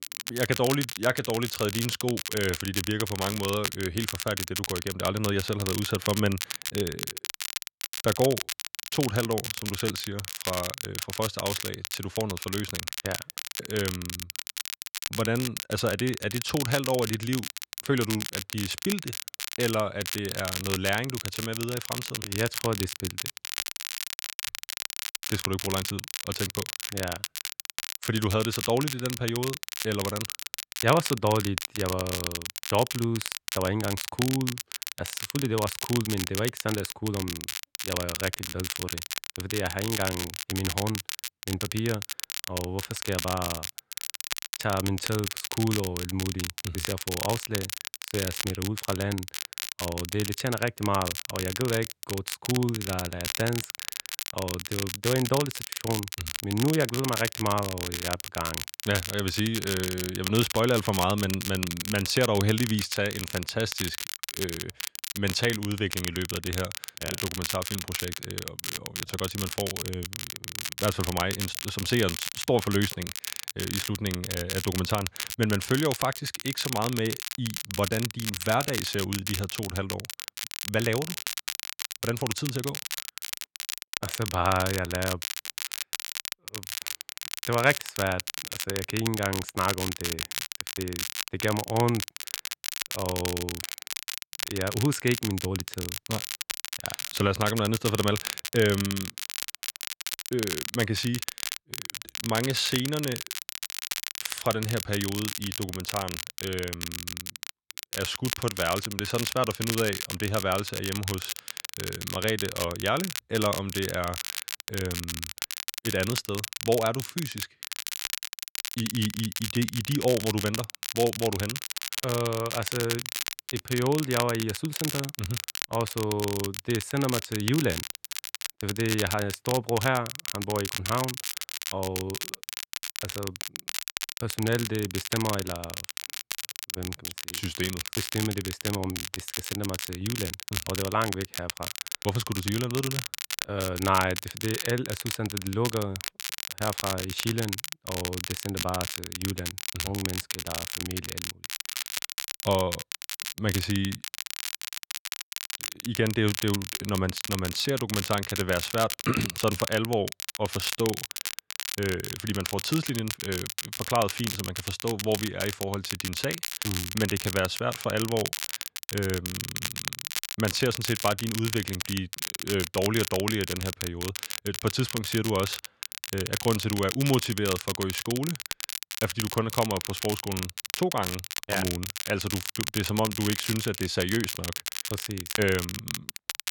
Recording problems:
crackle, like an old record; loud; 3 dB below the speech

